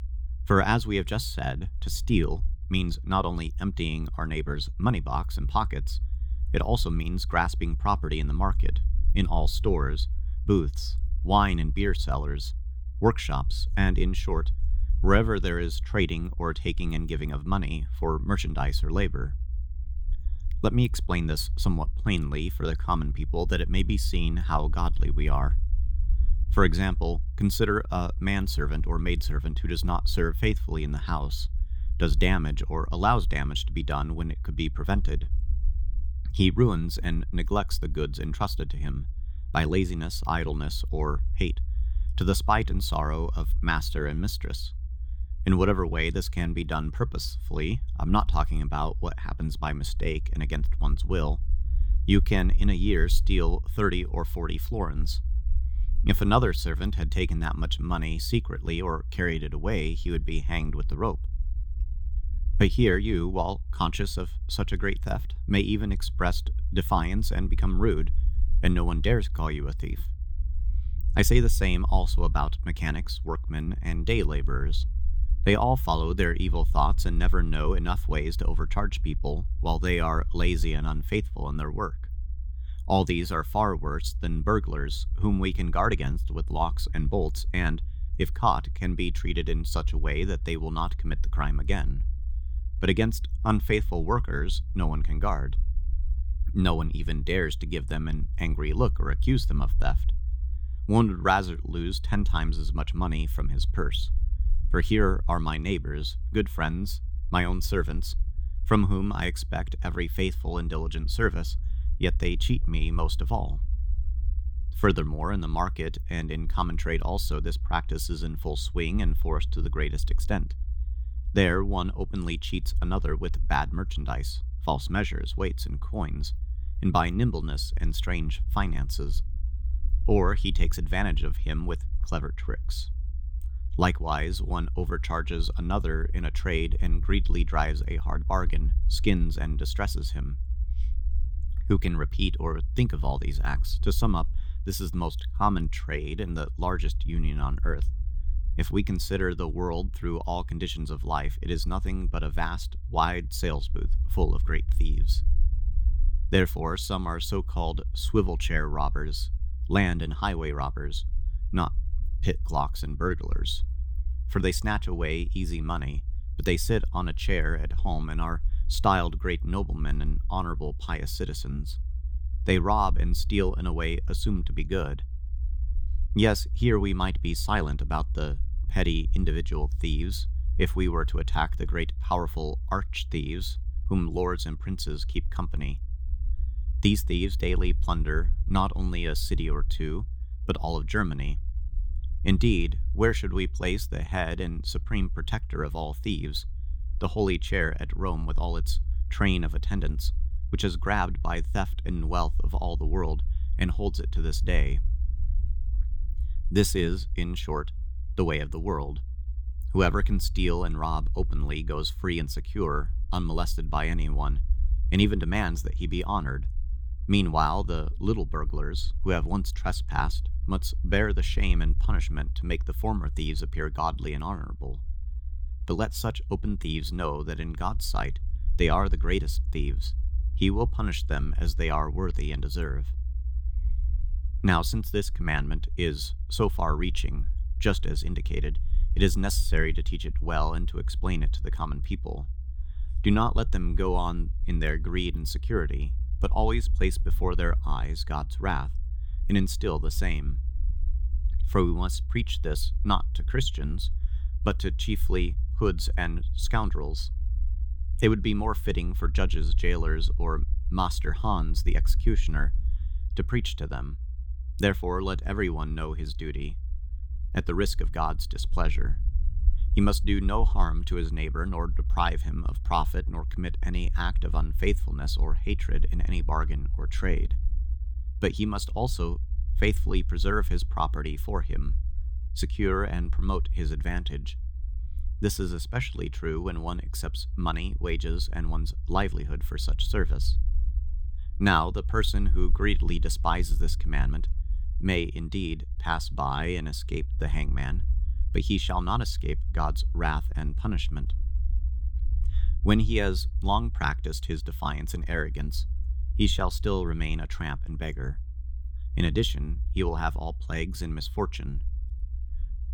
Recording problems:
low rumble; faint; throughout; 20 dB below the speech

